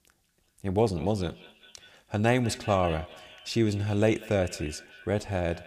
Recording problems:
echo of what is said; noticeable; throughout; 190 ms later, 20 dB below the speech

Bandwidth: 15 kHz